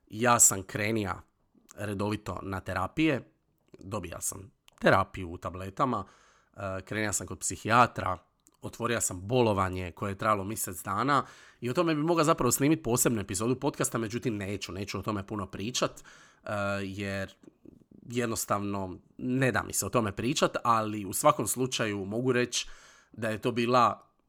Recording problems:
none

